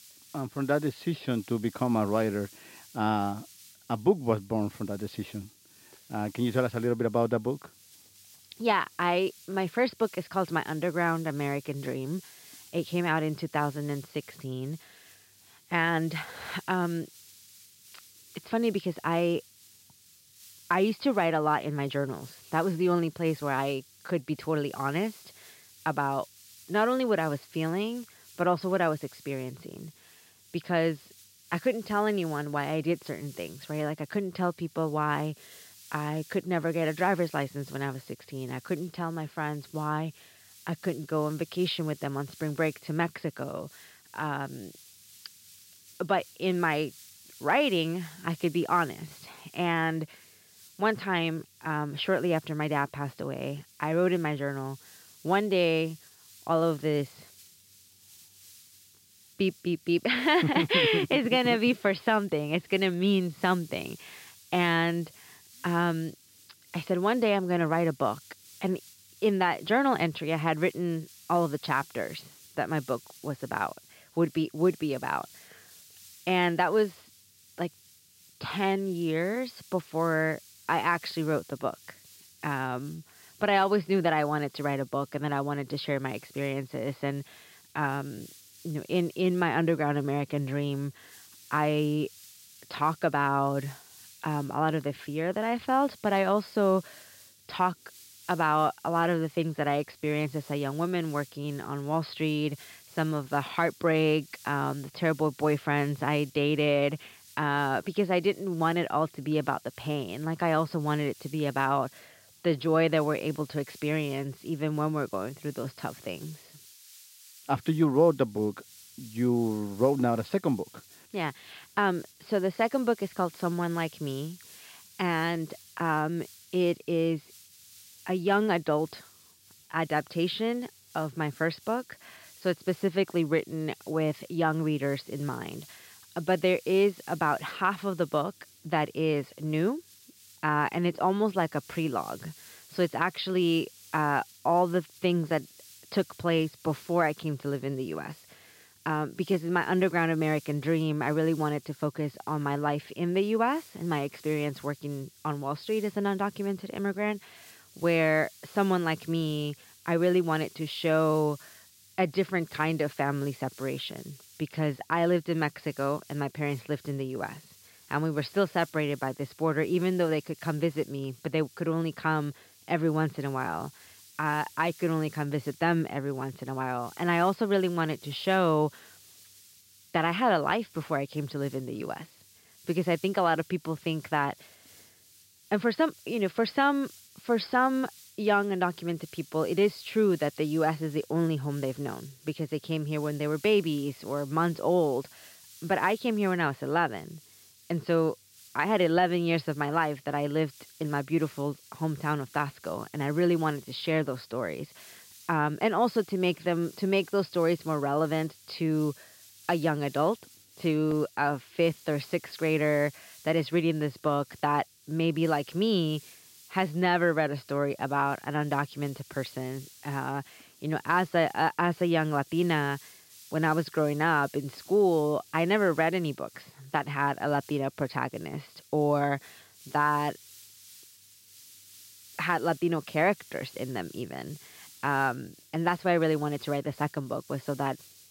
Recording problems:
high frequencies cut off; noticeable; nothing above 5.5 kHz
hiss; faint; throughout; 20 dB below the speech

